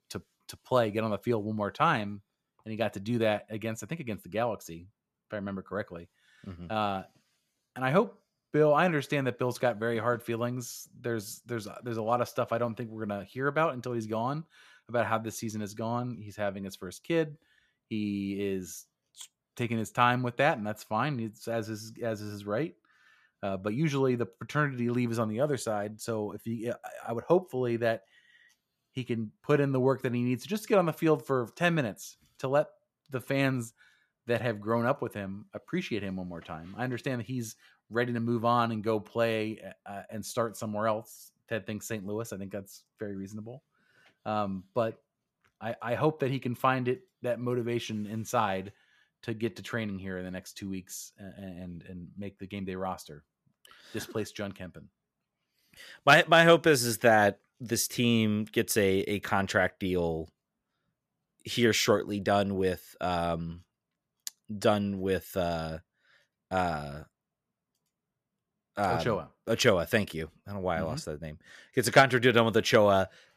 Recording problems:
none

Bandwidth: 14.5 kHz